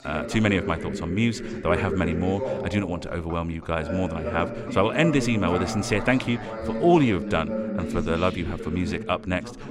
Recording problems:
background chatter; loud; throughout; 2 voices, 6 dB below the speech

